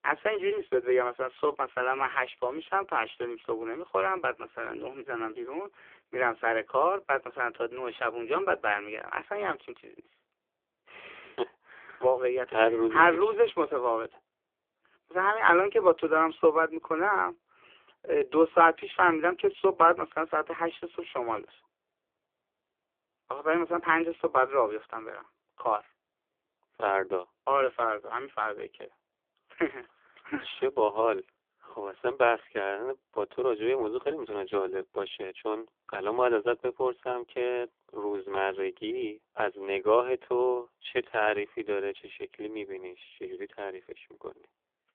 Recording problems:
phone-call audio; poor line; nothing above 3.5 kHz

